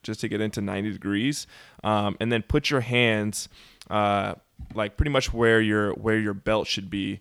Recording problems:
none

